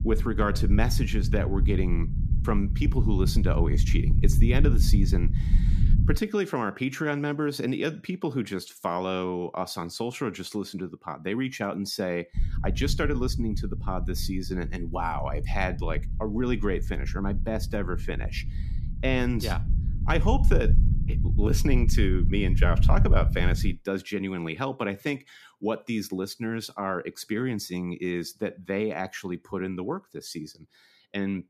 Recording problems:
low rumble; noticeable; until 6 s and from 12 to 24 s; 10 dB below the speech

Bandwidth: 14.5 kHz